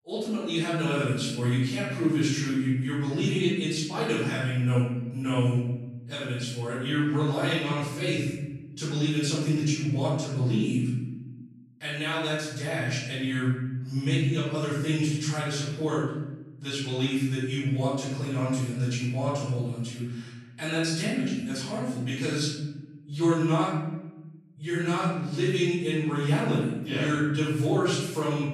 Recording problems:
room echo; strong; dies away in 1.1 s
off-mic speech; far

